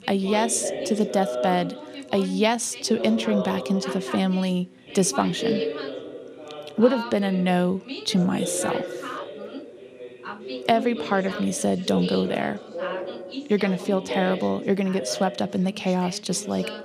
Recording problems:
background chatter; loud; throughout; 2 voices, 8 dB below the speech

